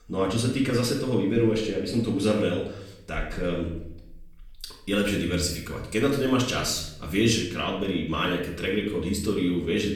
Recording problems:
off-mic speech; far
room echo; noticeable; dies away in 0.6 s

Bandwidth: 17.5 kHz